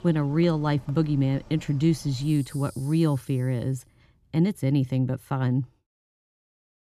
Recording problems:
animal sounds; faint; until 3 s; 25 dB below the speech

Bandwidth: 13.5 kHz